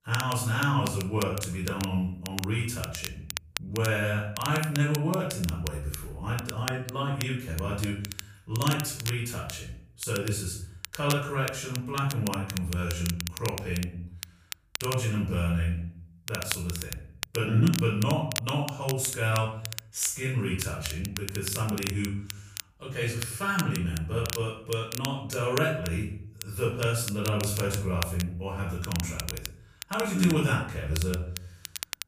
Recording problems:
off-mic speech; far
room echo; noticeable; dies away in 0.5 s
crackle, like an old record; loud; 9 dB below the speech

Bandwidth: 15 kHz